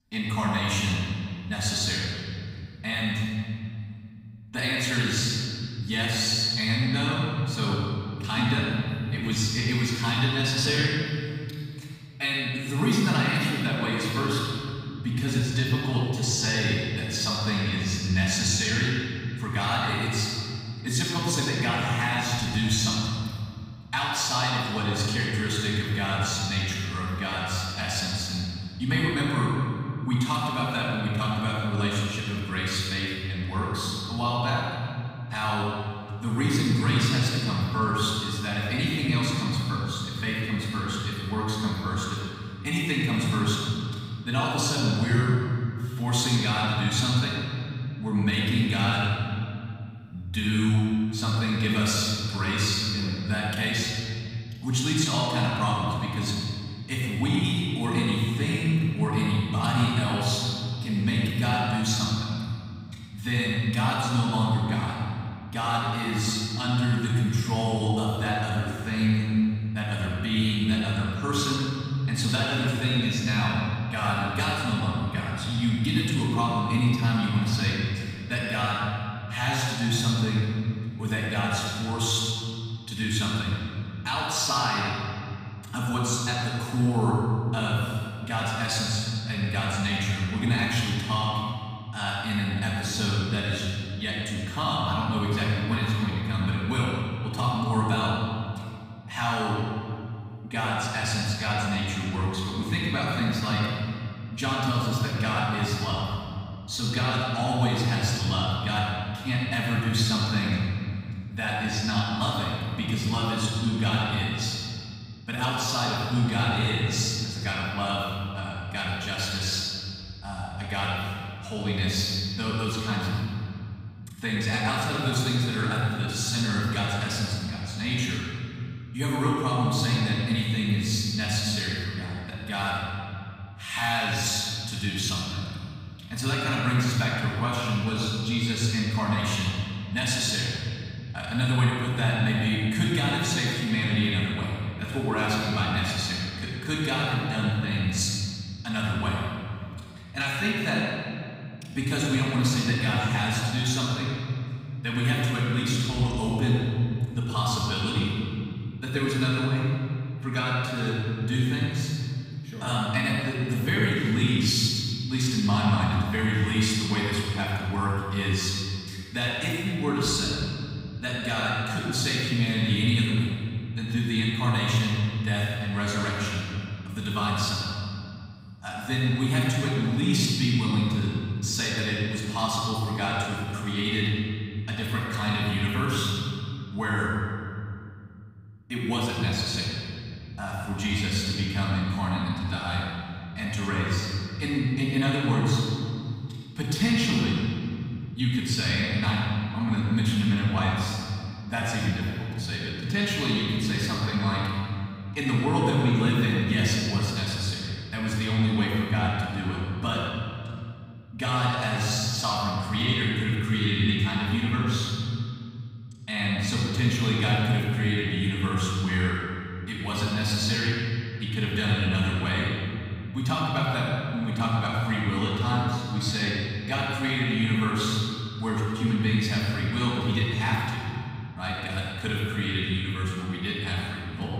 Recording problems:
room echo; strong; dies away in 2.5 s
off-mic speech; far

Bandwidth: 15.5 kHz